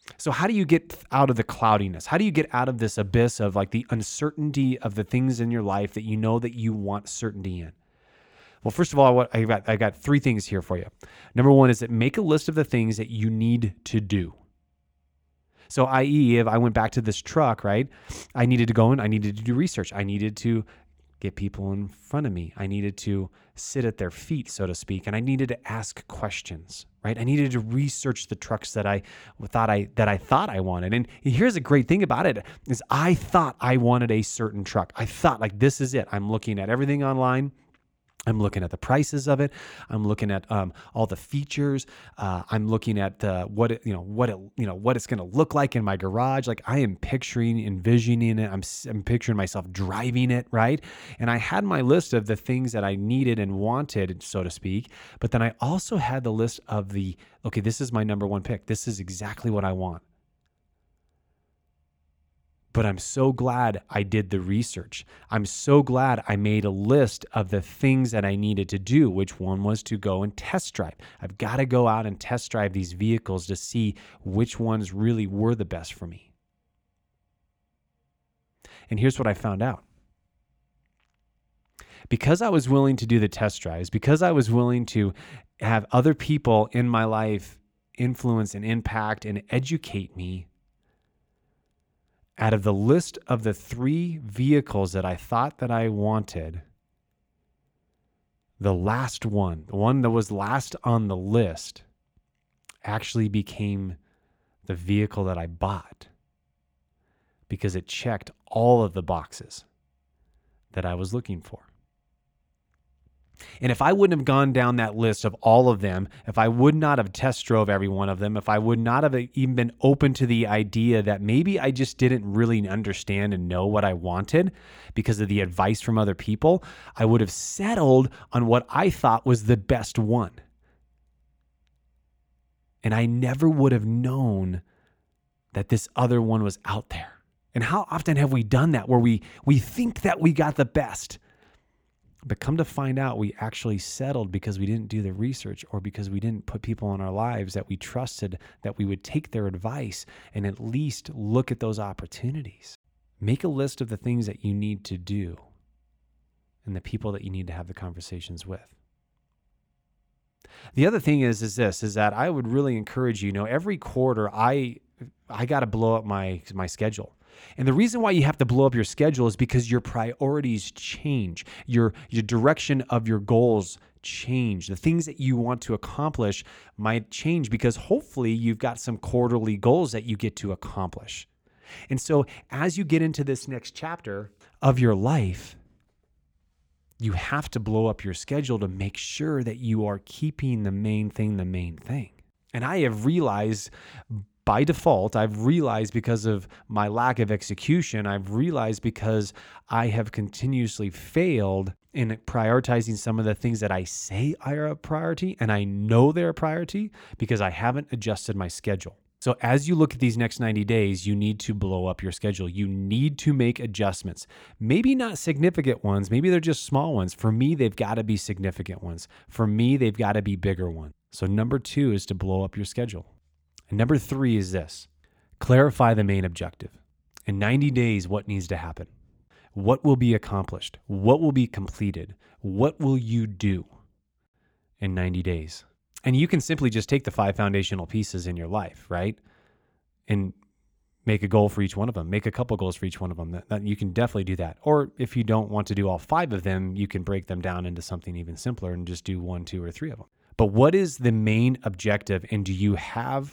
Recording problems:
none

